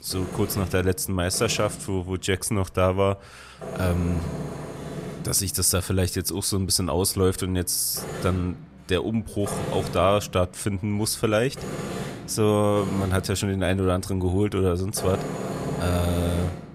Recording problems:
machinery noise; loud; throughout; 10 dB below the speech

